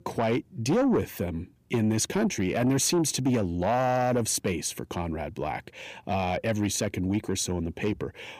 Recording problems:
distortion; slight; 10 dB below the speech

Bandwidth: 15 kHz